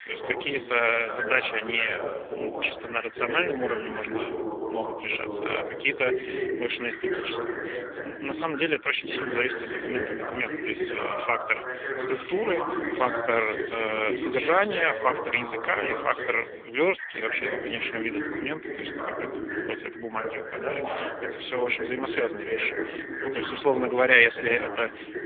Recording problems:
phone-call audio; poor line; nothing above 3.5 kHz
voice in the background; loud; throughout; 5 dB below the speech

